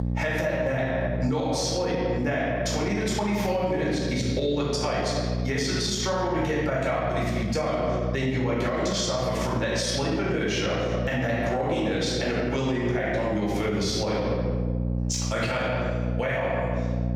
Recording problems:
off-mic speech; far
room echo; noticeable; dies away in 1.2 s
squashed, flat; somewhat
electrical hum; noticeable; throughout; 60 Hz, 15 dB below the speech

